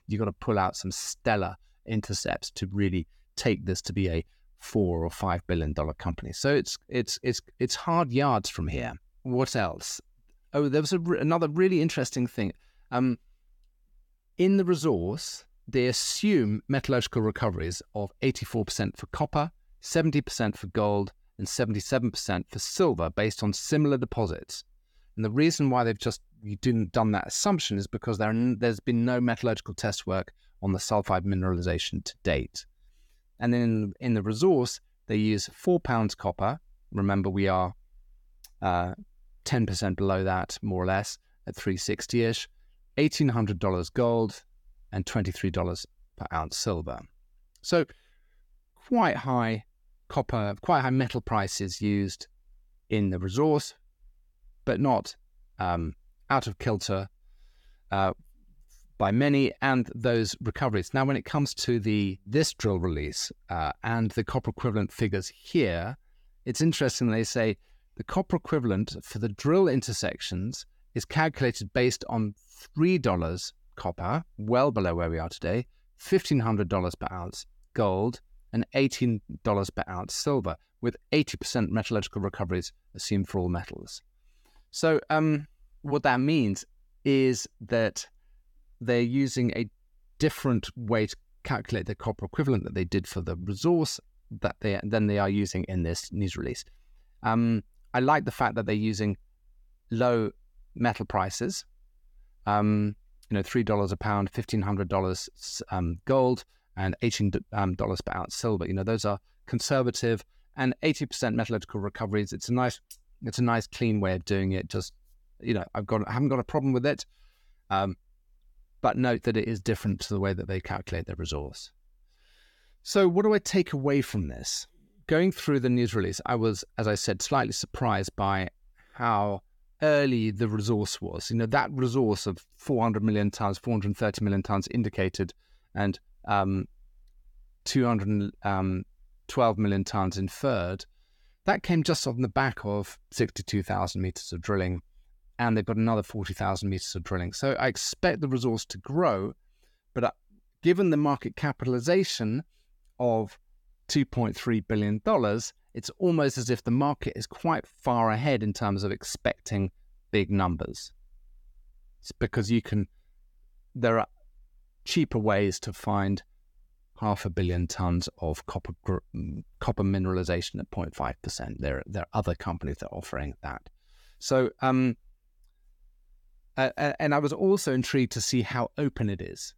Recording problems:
none

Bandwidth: 18 kHz